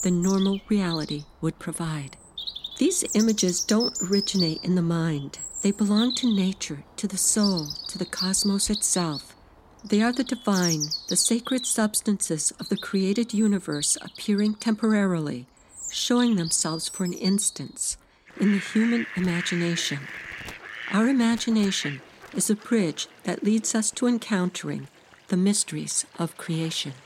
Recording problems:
animal sounds; loud; throughout; 8 dB below the speech

